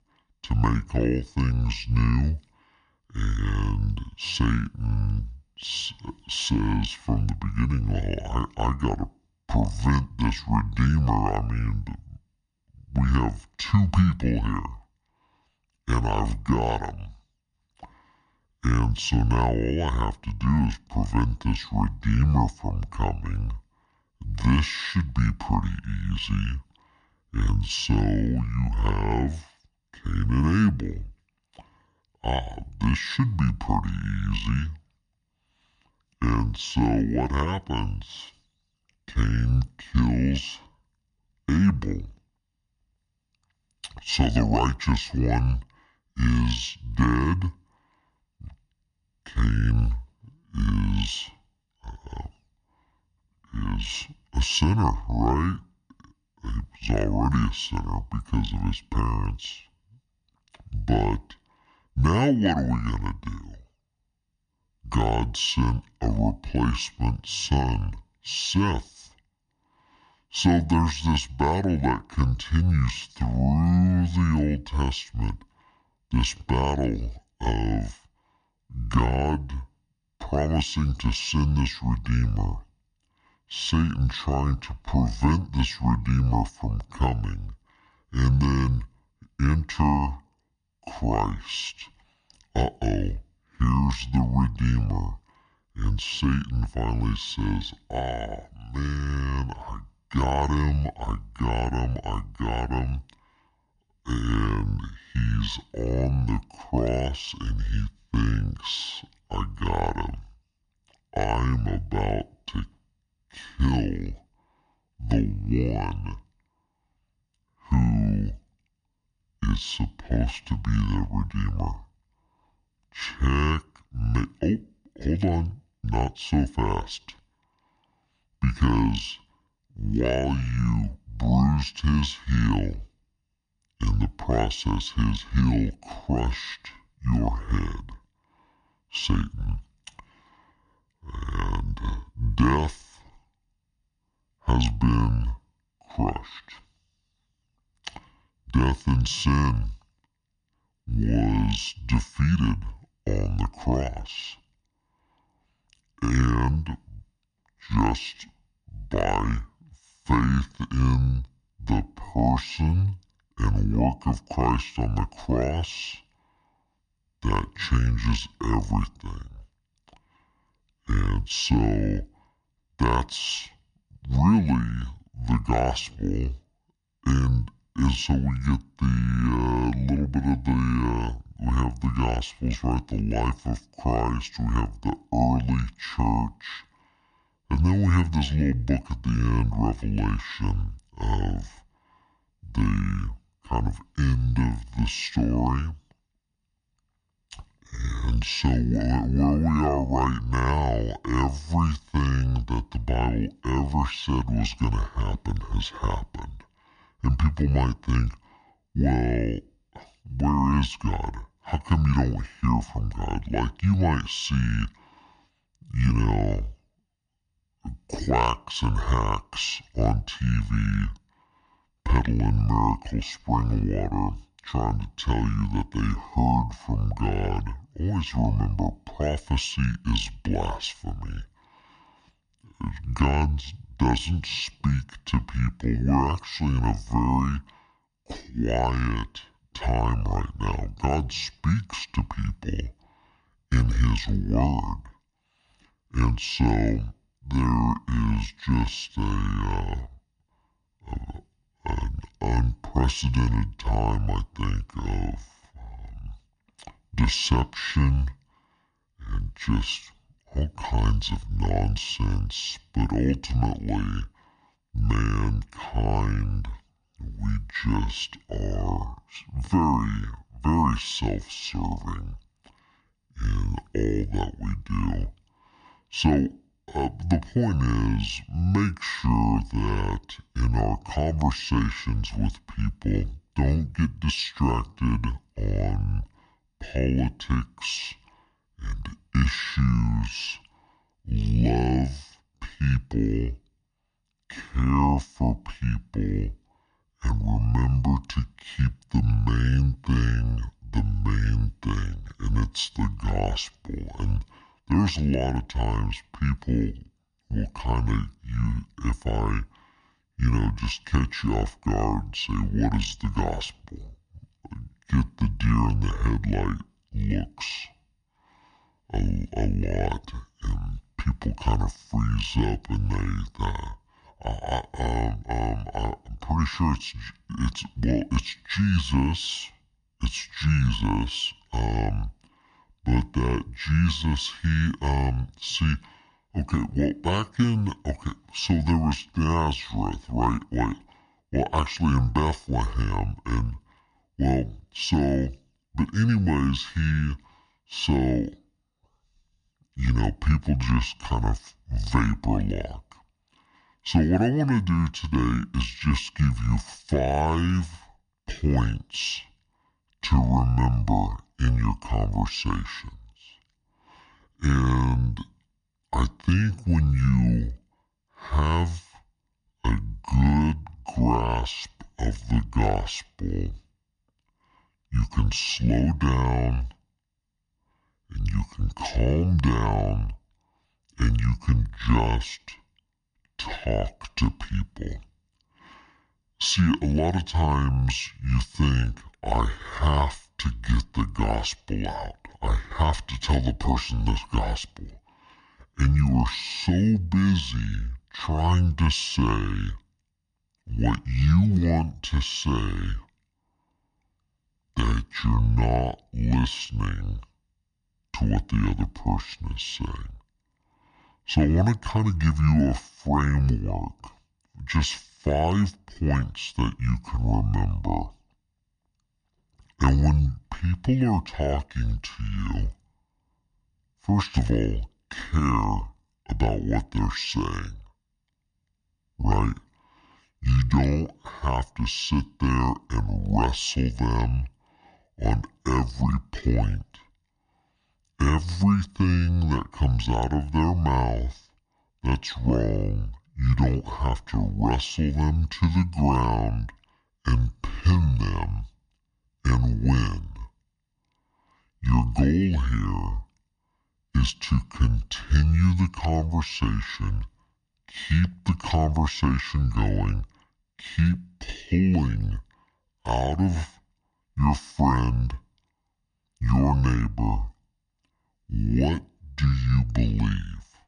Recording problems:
wrong speed and pitch; too slow and too low; 0.6 times normal speed

